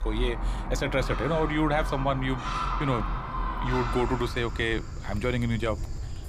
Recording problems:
animal sounds; loud; throughout; 4 dB below the speech

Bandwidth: 15 kHz